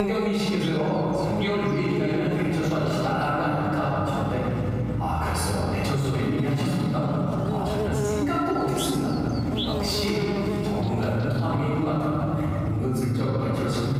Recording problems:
room echo; strong; dies away in 2.7 s
off-mic speech; far
squashed, flat; somewhat
electrical hum; loud; throughout; 60 Hz, 8 dB below the speech
abrupt cut into speech; at the start

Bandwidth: 15.5 kHz